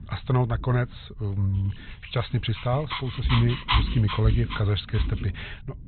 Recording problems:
high frequencies cut off; severe; nothing above 4 kHz
low rumble; noticeable; throughout; 15 dB below the speech
dog barking; noticeable; from 2.5 to 5 s; peak level with the speech

